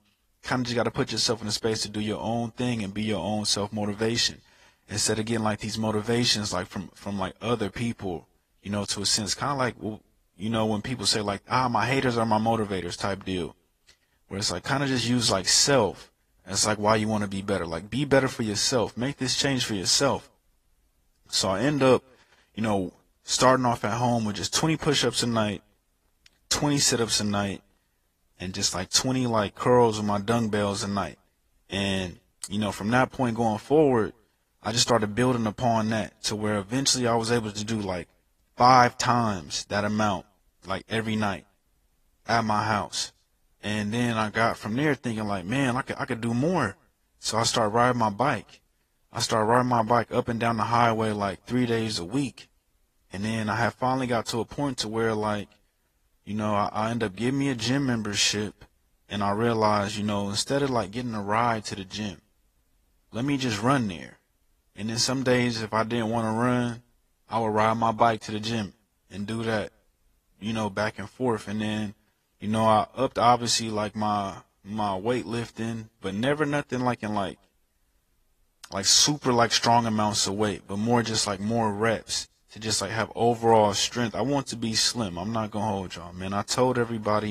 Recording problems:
garbled, watery; slightly; nothing above 14.5 kHz
uneven, jittery; slightly; from 16 s to 1:23
abrupt cut into speech; at the end

